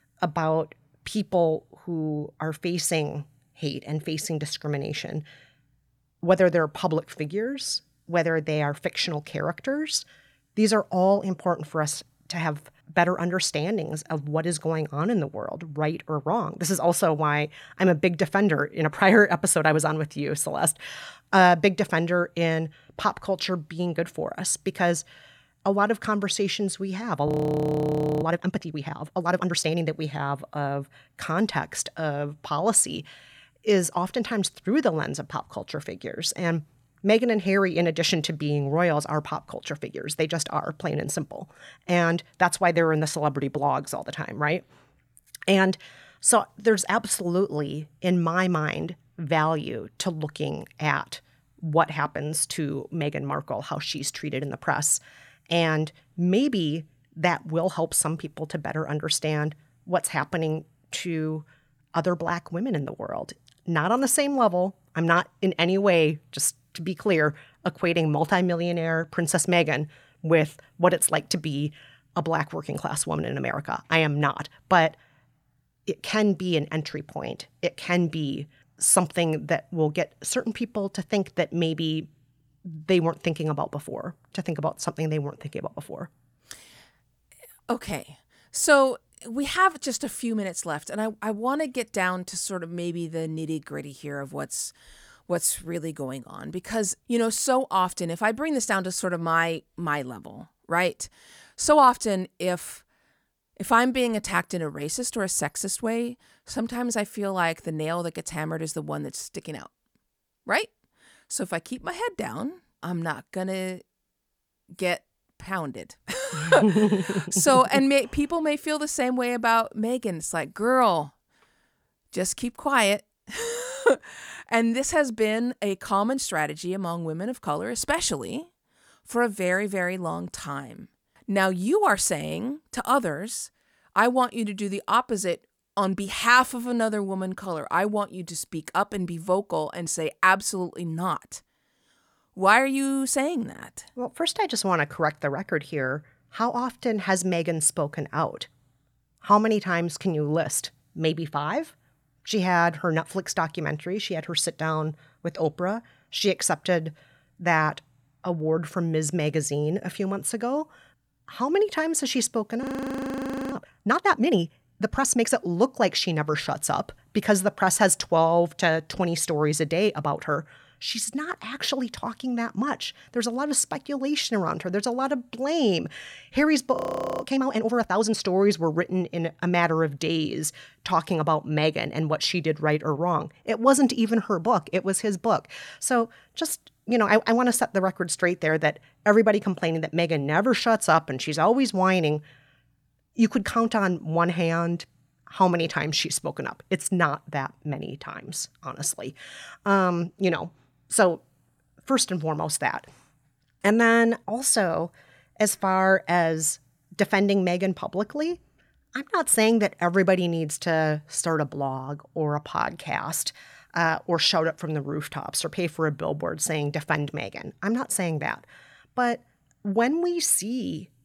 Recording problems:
audio freezing; at 27 s for 1 s, at 2:43 for 1 s and at 2:57

